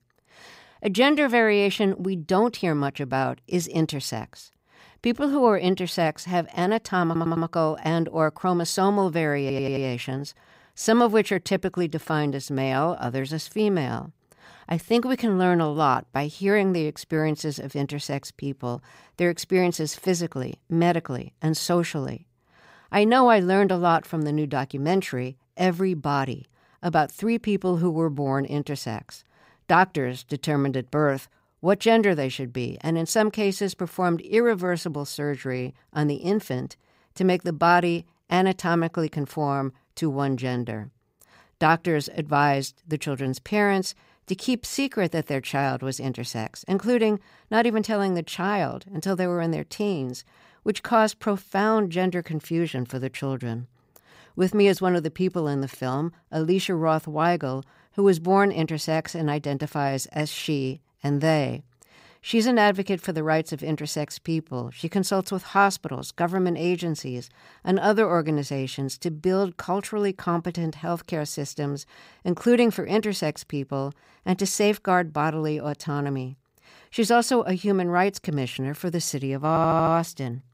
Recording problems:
audio stuttering; at 7 s, at 9.5 s and at 1:19

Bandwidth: 15.5 kHz